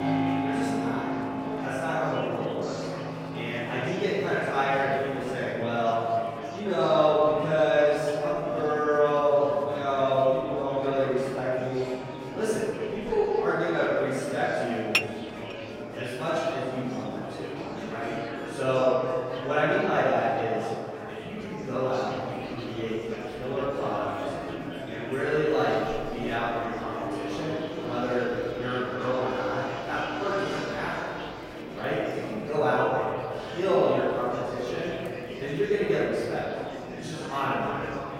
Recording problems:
room echo; strong; dies away in 2.3 s
off-mic speech; far
background music; noticeable; throughout; 10 dB below the speech
murmuring crowd; noticeable; throughout; 10 dB below the speech
clattering dishes; loud; at 15 s; peak 2 dB above the speech

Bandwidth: 16 kHz